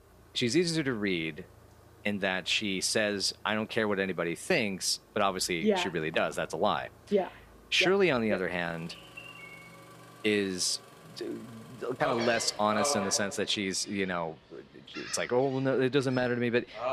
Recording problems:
animal sounds; noticeable; throughout; 10 dB below the speech
traffic noise; faint; throughout; 25 dB below the speech

